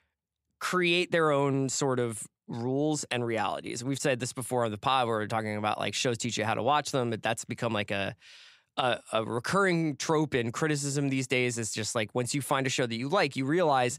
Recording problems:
none

